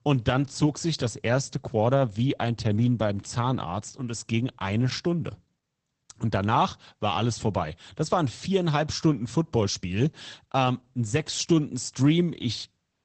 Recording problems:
garbled, watery; badly; nothing above 8 kHz

